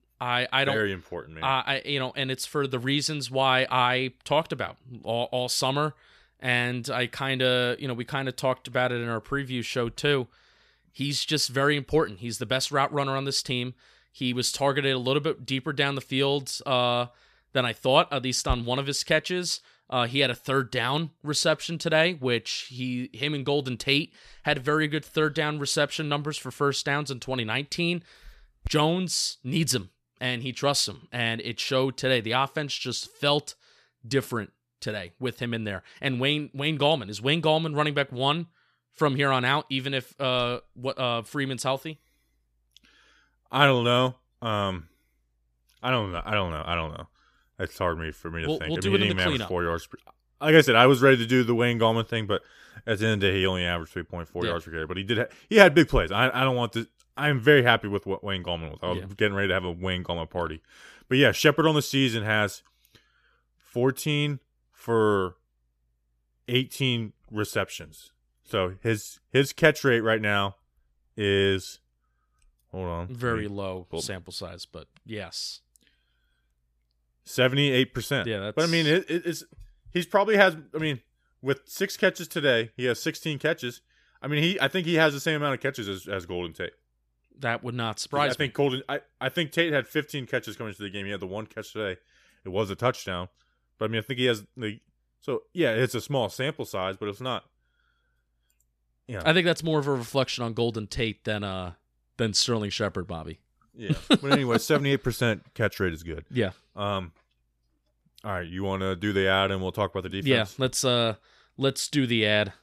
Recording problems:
none

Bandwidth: 14.5 kHz